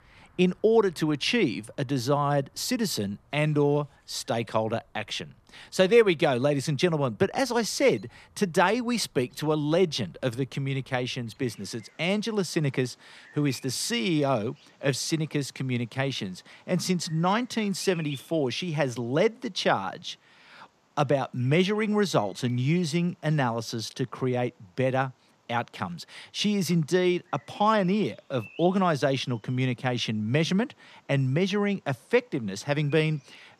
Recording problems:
animal sounds; faint; throughout; 25 dB below the speech

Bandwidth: 14 kHz